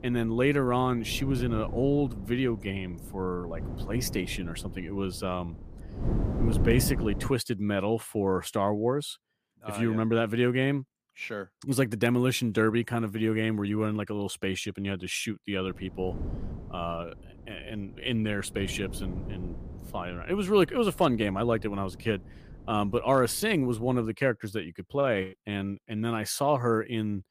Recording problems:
wind noise on the microphone; occasional gusts; until 7.5 s and from 16 to 24 s; 15 dB below the speech

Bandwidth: 15 kHz